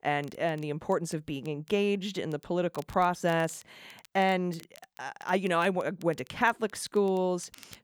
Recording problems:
crackle, like an old record; faint; 25 dB below the speech

